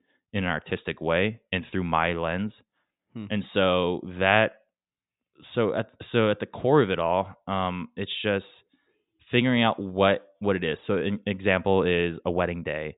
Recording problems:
high frequencies cut off; severe; nothing above 4 kHz

